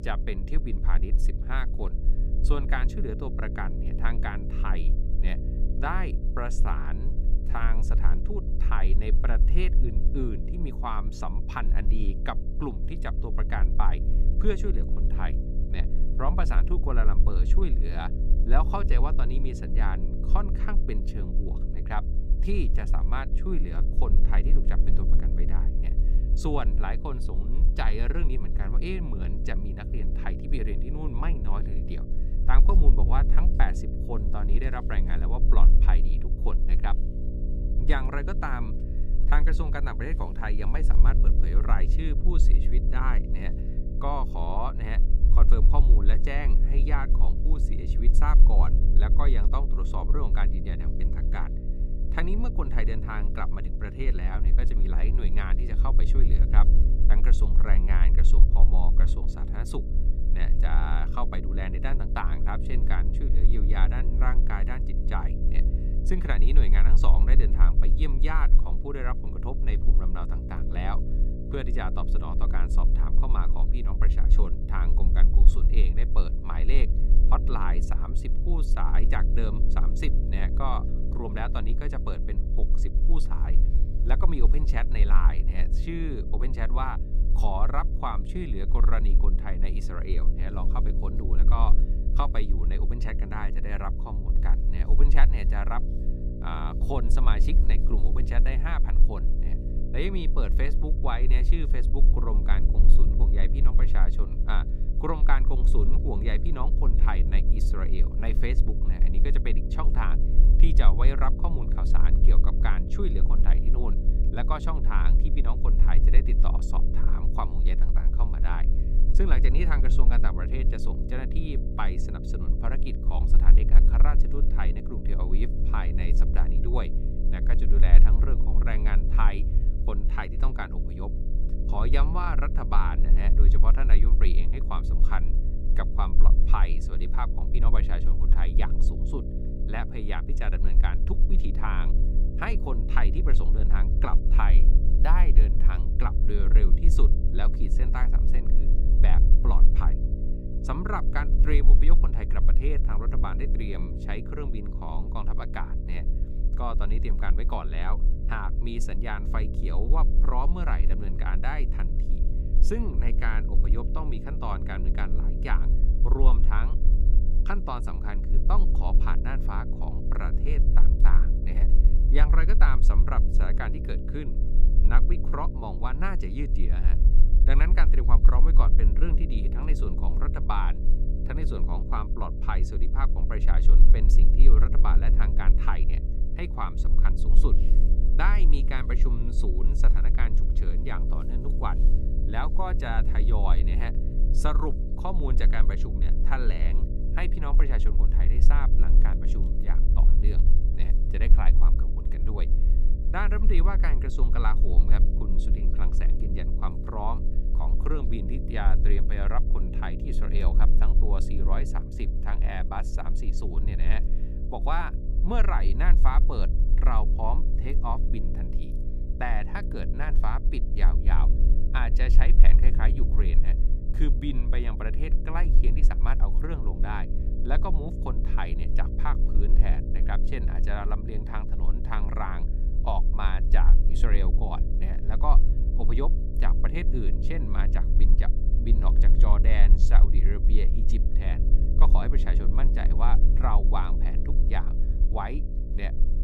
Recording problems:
electrical hum; loud; throughout; 60 Hz, 10 dB below the speech
low rumble; noticeable; throughout; 15 dB below the speech

